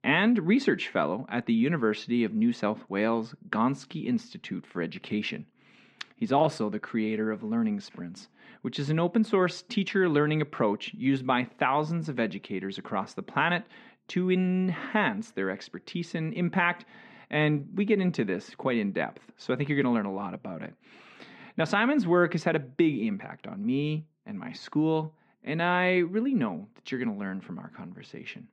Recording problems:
muffled; slightly; fading above 2.5 kHz

